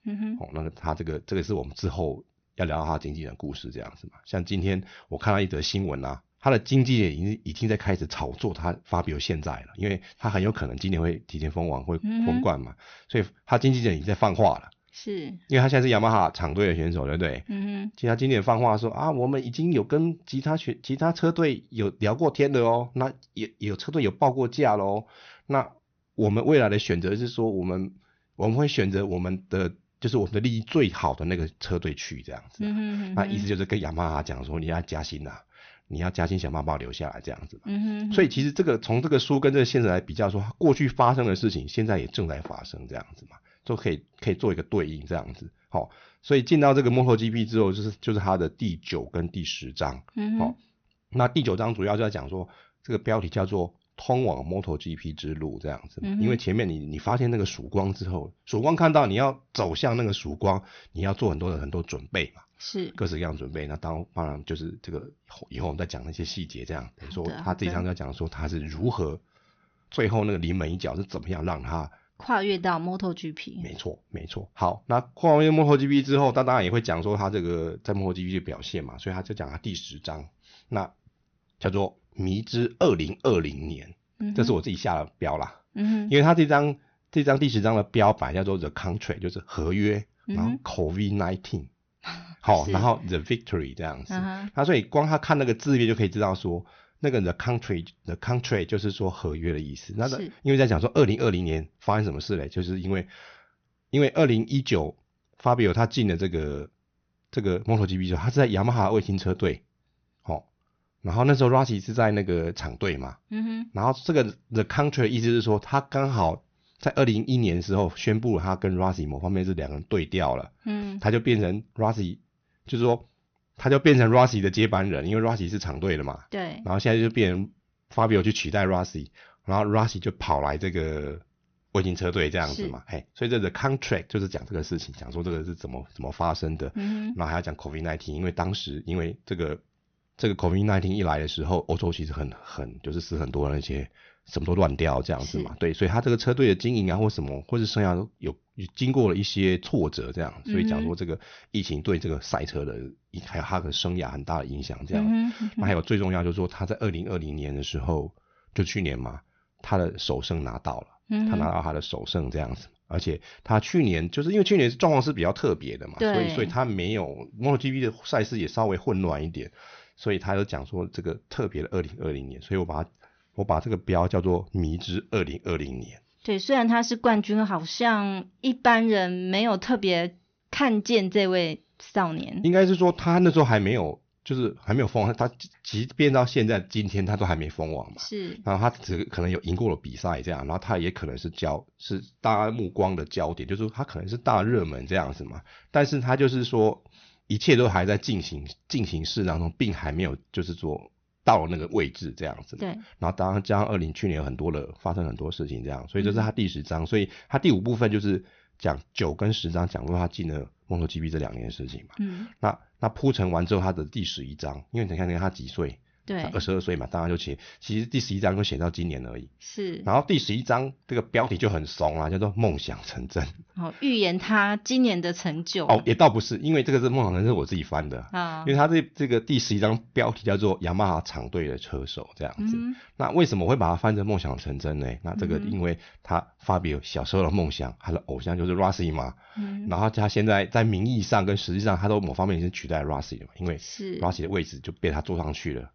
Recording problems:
high frequencies cut off; noticeable; nothing above 6.5 kHz

